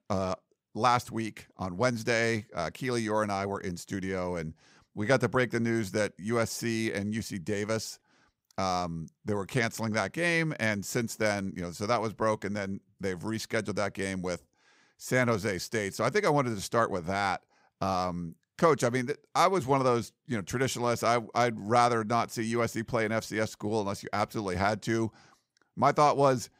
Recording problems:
none

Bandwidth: 15.5 kHz